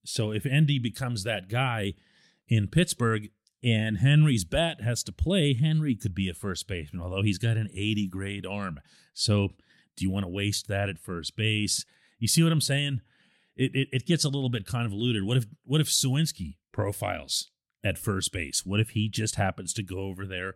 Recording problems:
none

